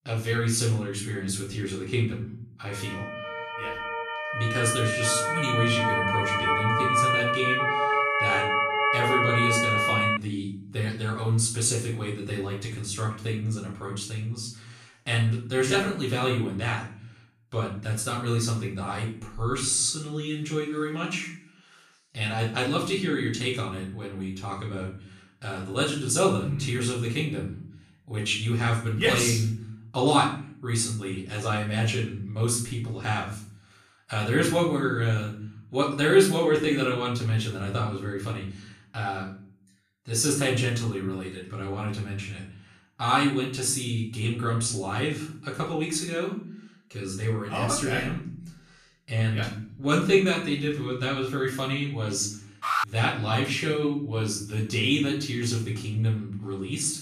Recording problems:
off-mic speech; far
room echo; noticeable; dies away in 0.5 s
siren; loud; from 3 to 10 s; peak 5 dB above the speech
alarm; loud; at 53 s; peak 1 dB above the speech

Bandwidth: 14.5 kHz